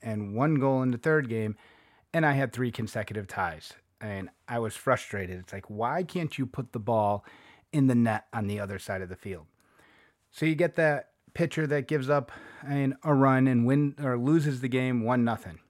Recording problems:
none

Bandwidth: 16 kHz